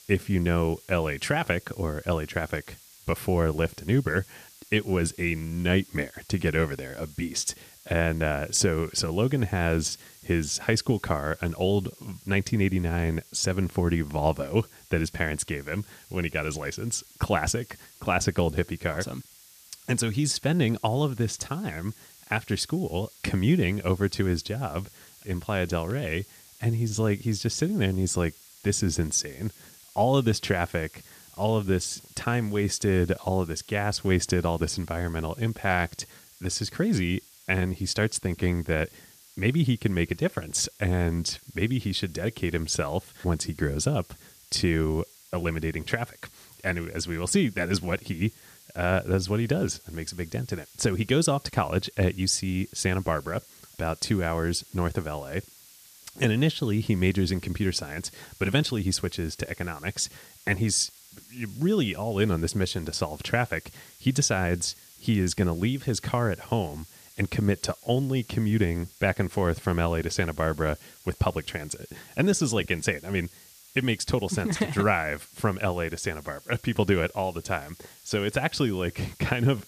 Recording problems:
hiss; faint; throughout; 20 dB below the speech

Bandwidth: 14.5 kHz